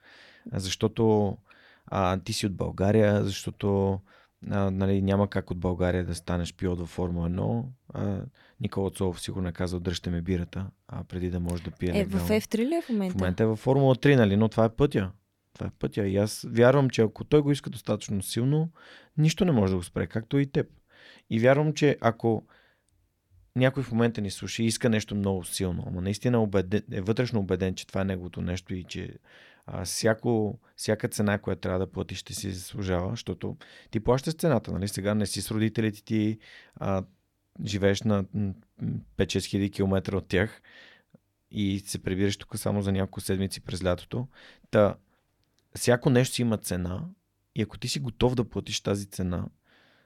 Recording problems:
none

